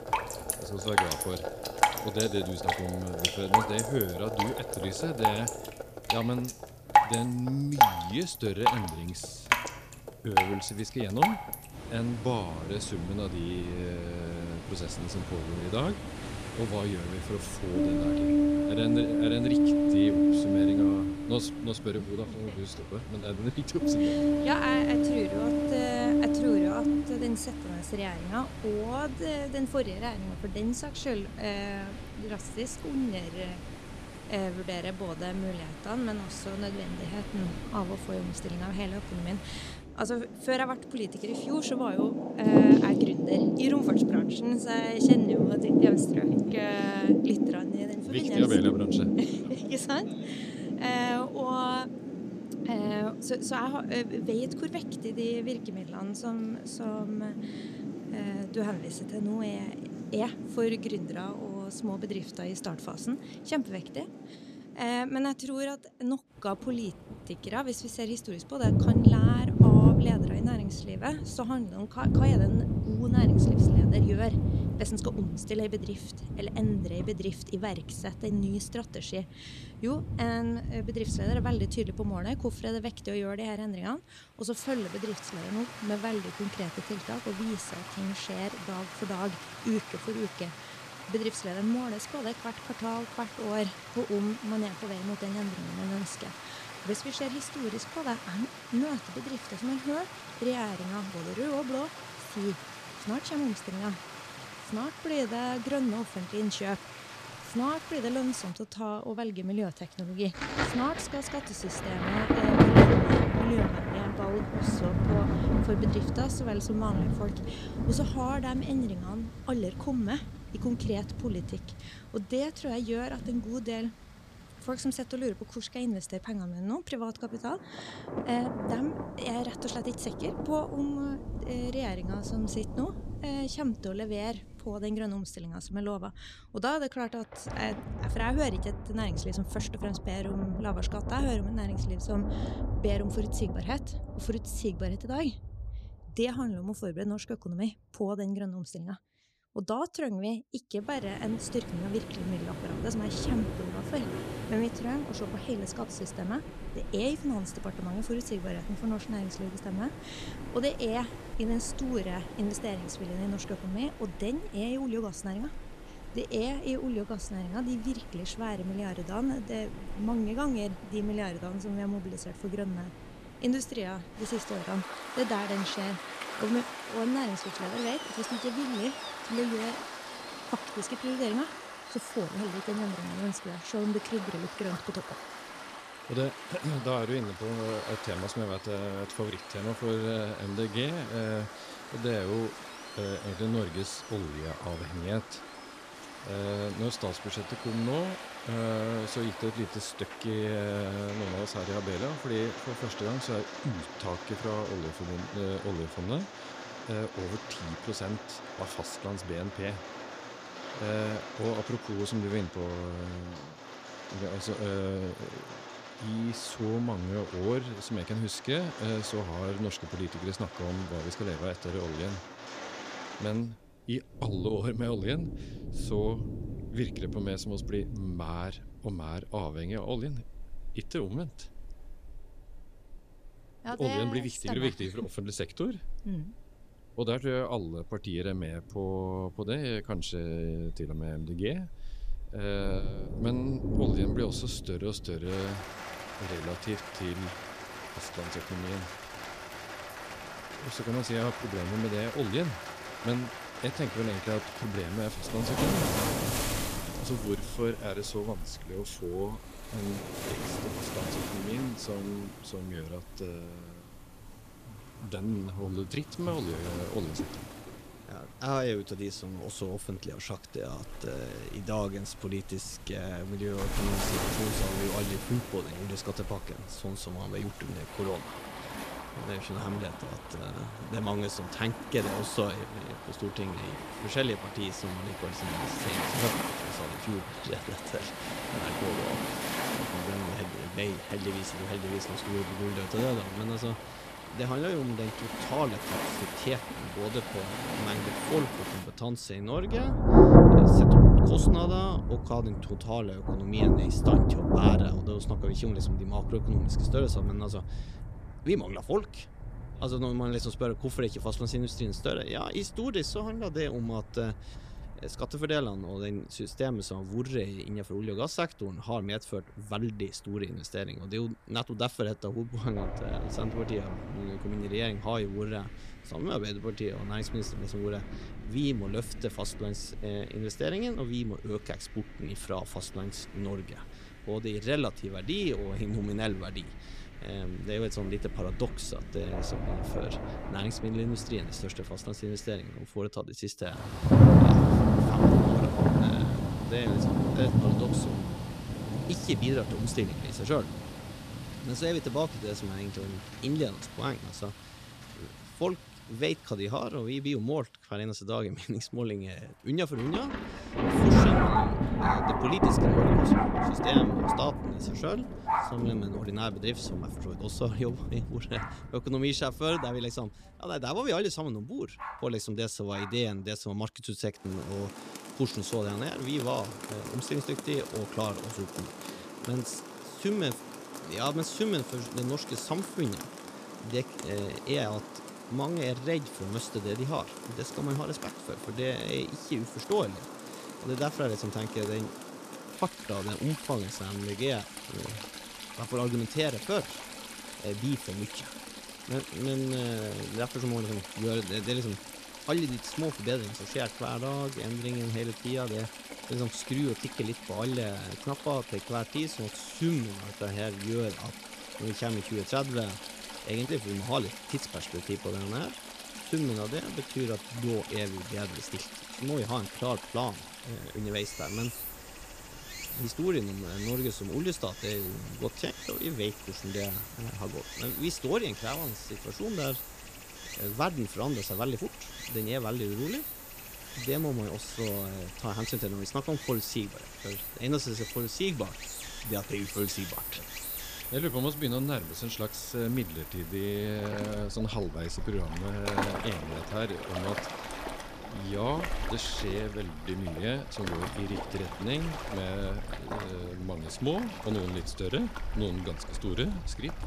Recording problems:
rain or running water; very loud; throughout; 3 dB above the speech

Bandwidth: 14.5 kHz